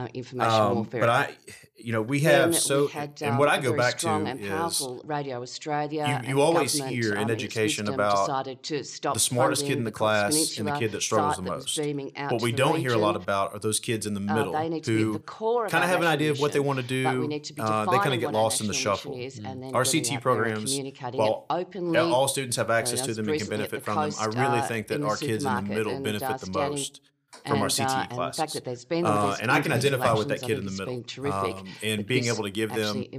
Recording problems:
voice in the background; loud; throughout; 5 dB below the speech

